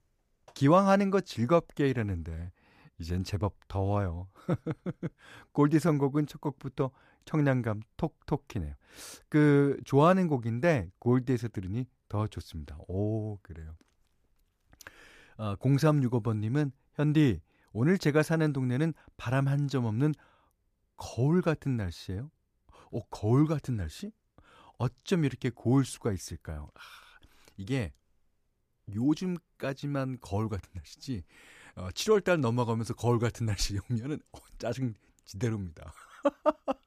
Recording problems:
none

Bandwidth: 14.5 kHz